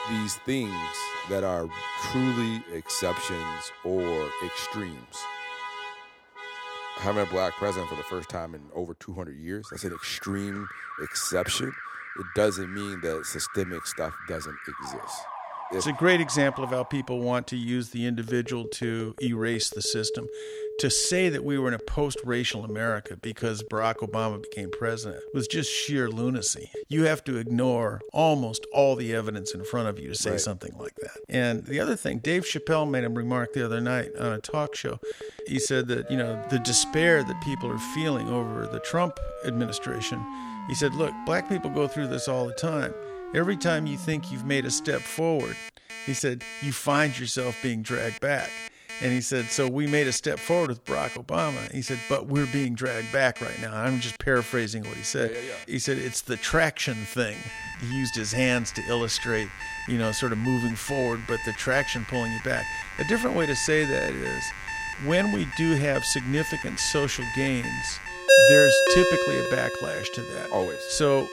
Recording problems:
alarms or sirens; loud; throughout; 4 dB below the speech

